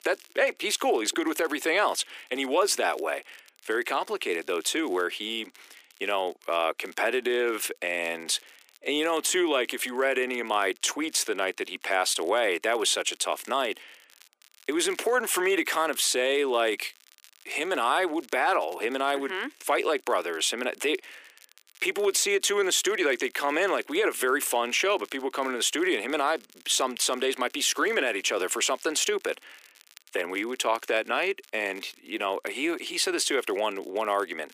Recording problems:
thin; very; fading below 300 Hz
crackle, like an old record; faint; 30 dB below the speech

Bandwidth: 15 kHz